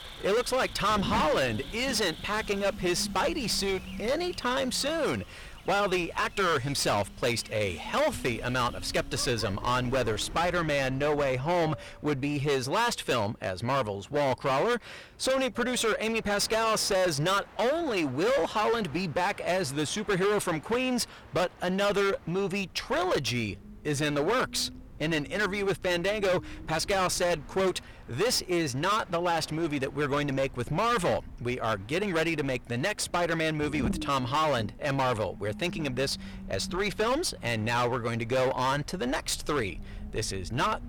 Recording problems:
distortion; heavy; 18% of the sound clipped
animal sounds; noticeable; until 10 s; 20 dB below the speech
low rumble; noticeable; until 13 s and from 23 s on; 20 dB below the speech
train or aircraft noise; faint; throughout; 25 dB below the speech

